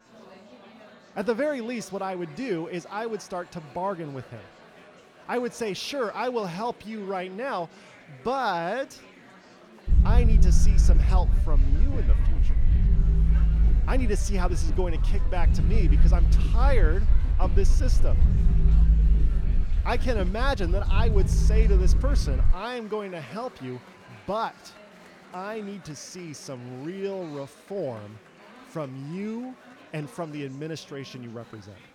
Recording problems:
low rumble; loud; from 10 to 23 s; 10 dB below the speech
murmuring crowd; noticeable; throughout; 15 dB below the speech

